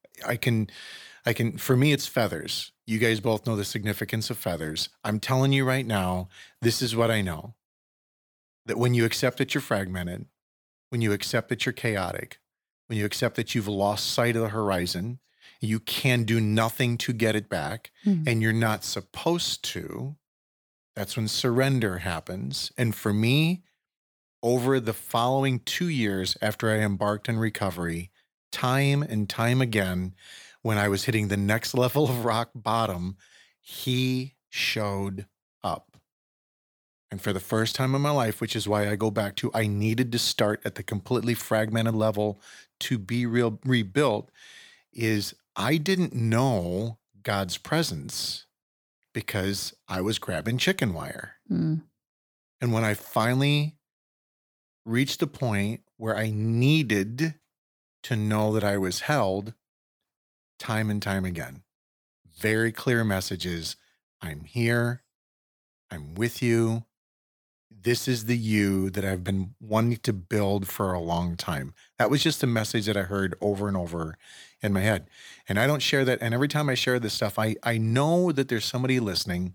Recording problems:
none

